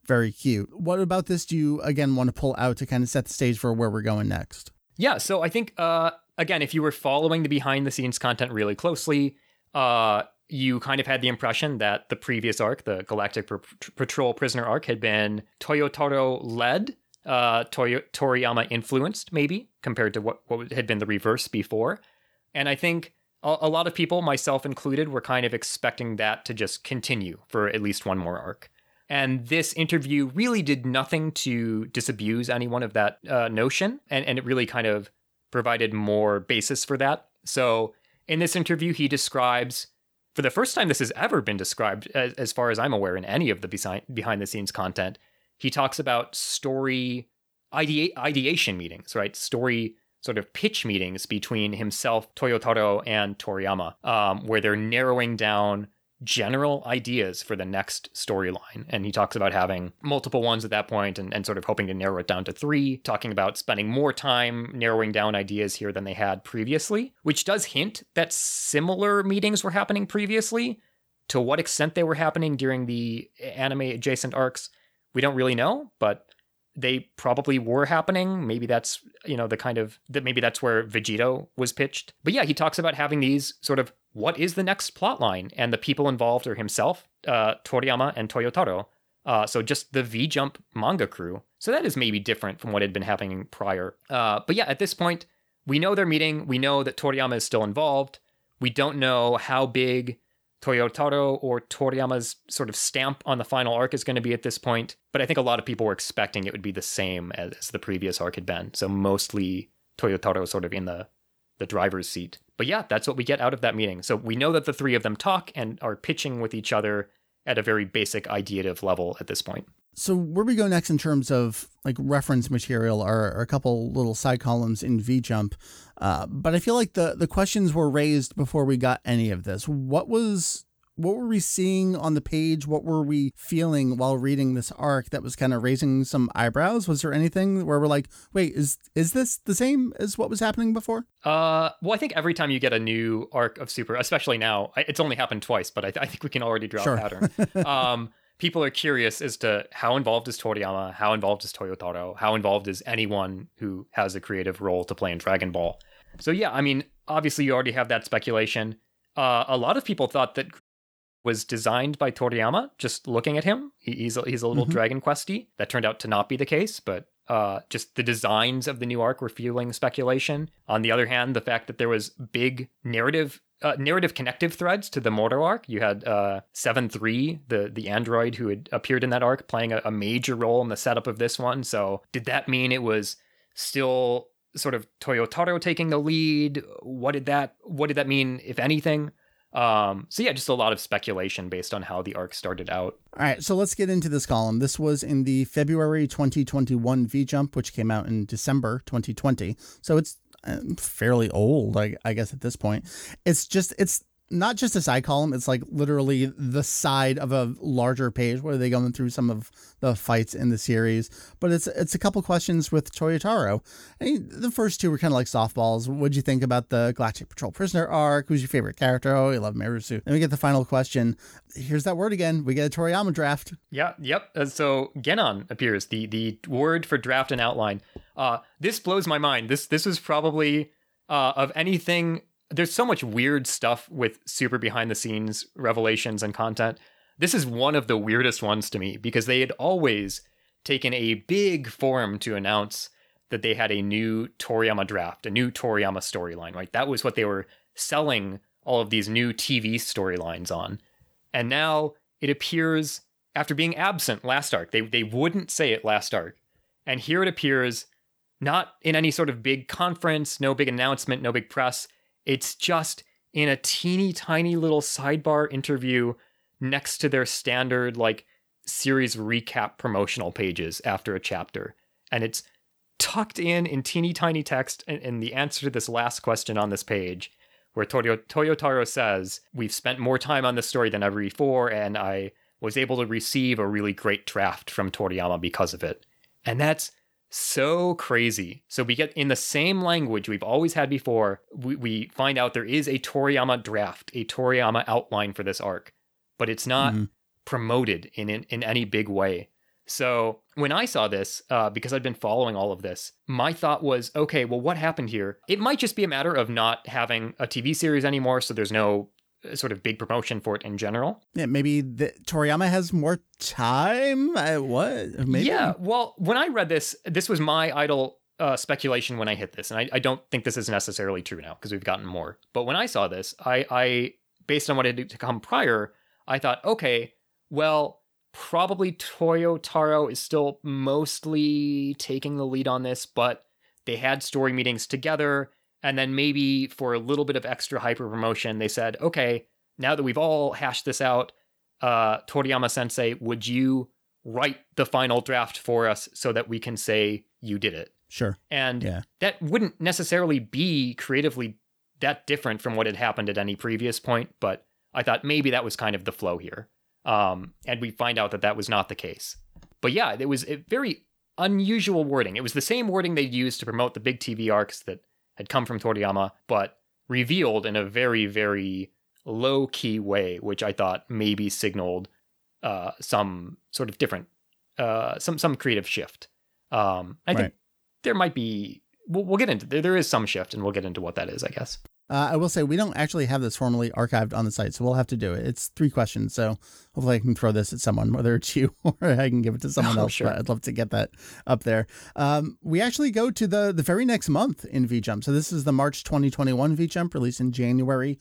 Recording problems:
audio cutting out; at 2:41 for 0.5 s

